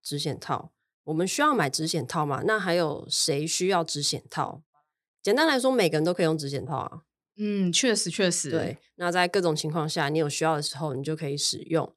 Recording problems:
none

